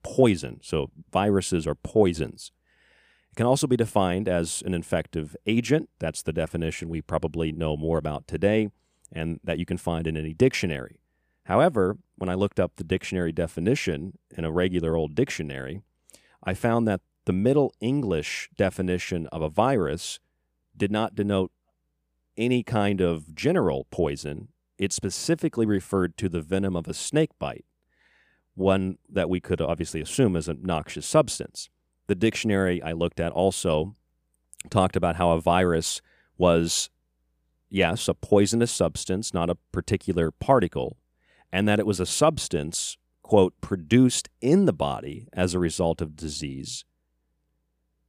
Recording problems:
none

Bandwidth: 15 kHz